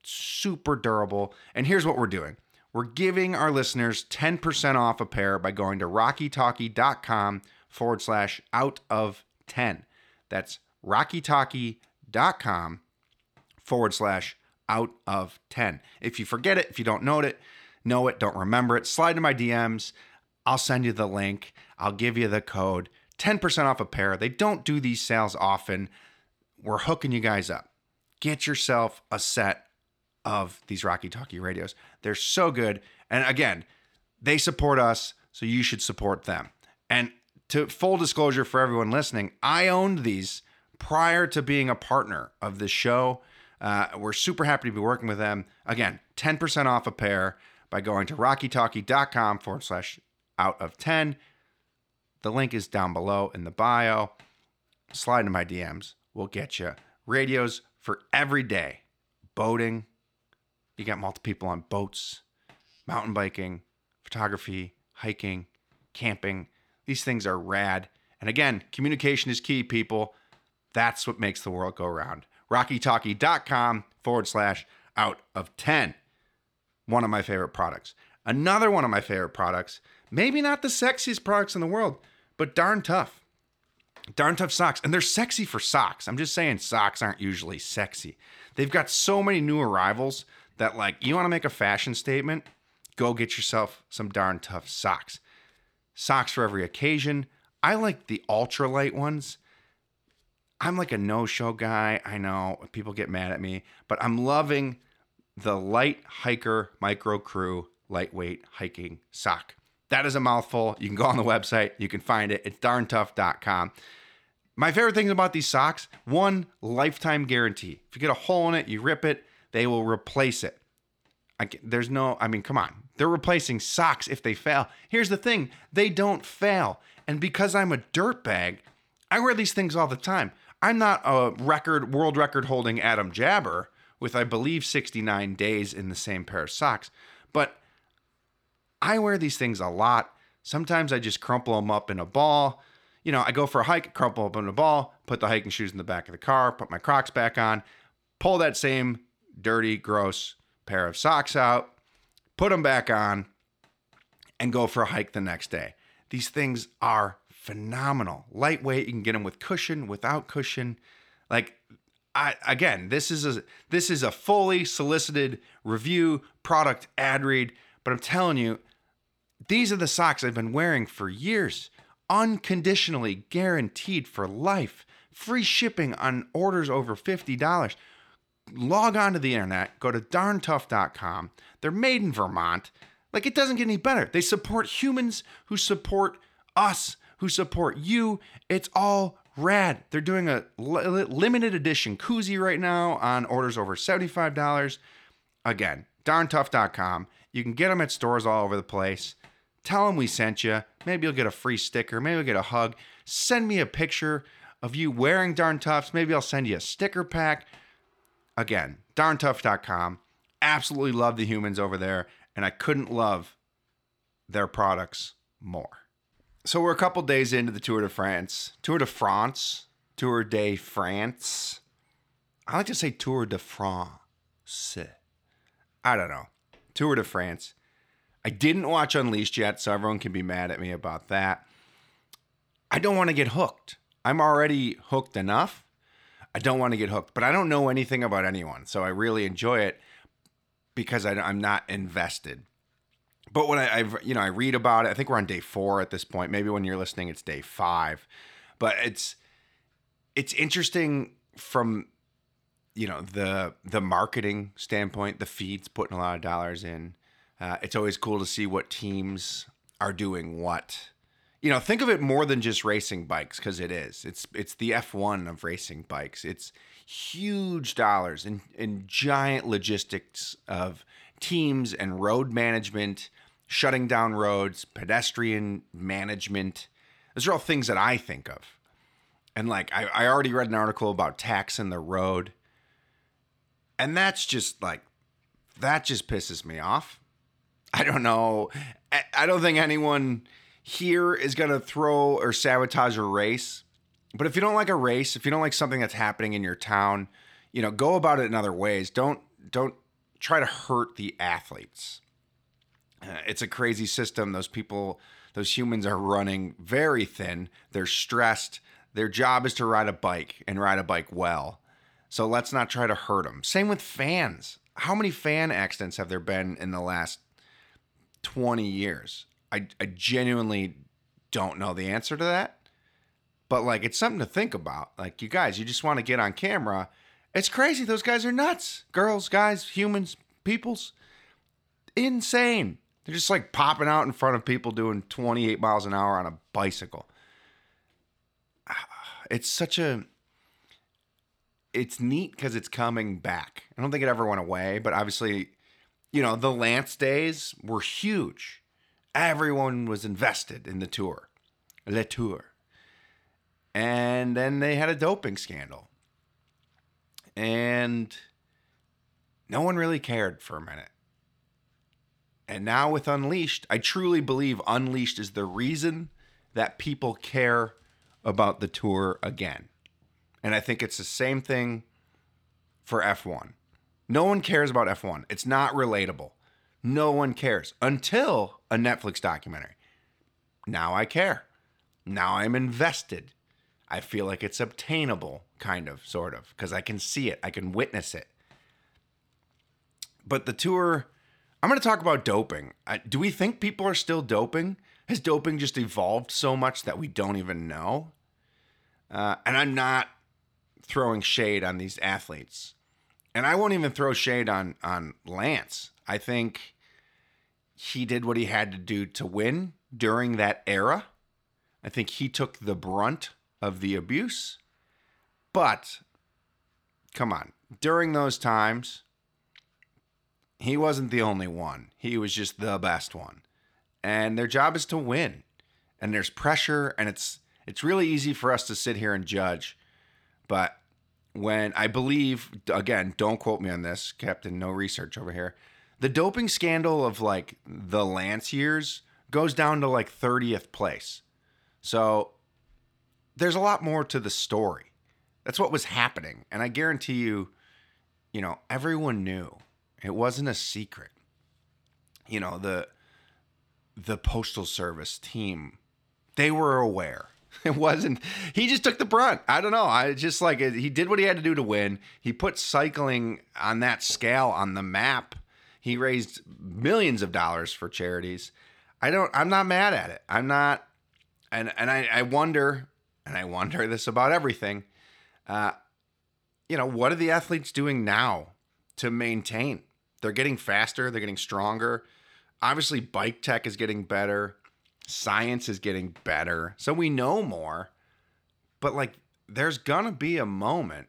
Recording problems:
none

